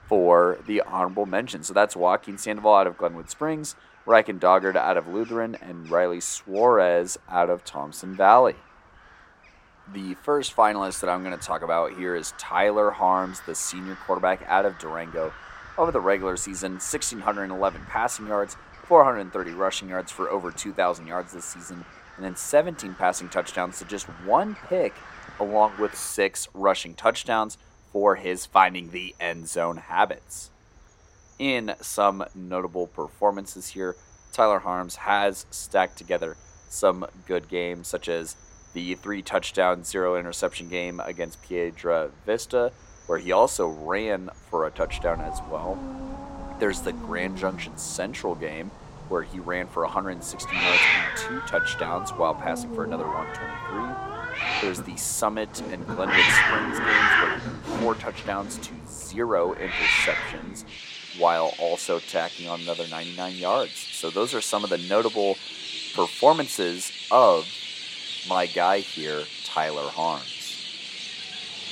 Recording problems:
animal sounds; loud; throughout; 2 dB below the speech

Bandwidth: 16 kHz